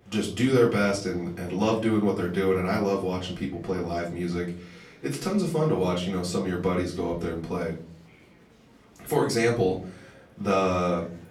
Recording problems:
off-mic speech; far
room echo; slight; dies away in 0.5 s
chatter from many people; faint; throughout; 30 dB below the speech

